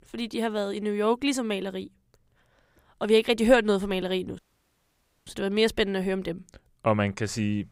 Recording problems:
audio cutting out; at 4.5 s for 1 s

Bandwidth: 15.5 kHz